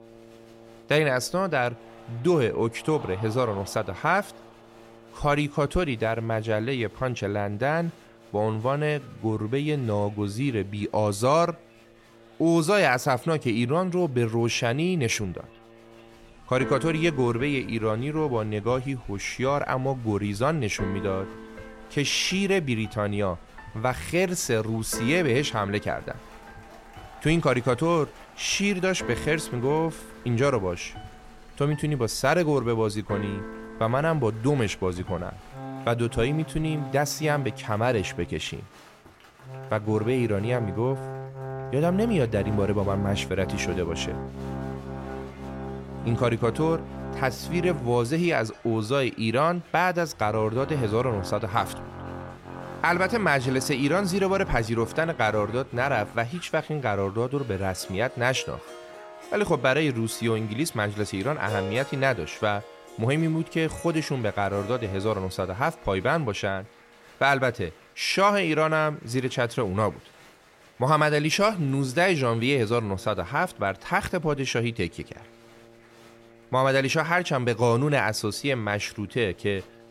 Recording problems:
background music; noticeable; throughout; 15 dB below the speech
crowd noise; faint; throughout; 25 dB below the speech

